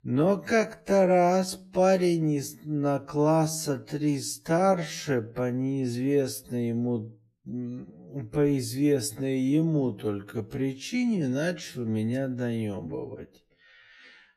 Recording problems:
wrong speed, natural pitch; too slow; 0.5 times normal speed

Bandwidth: 14 kHz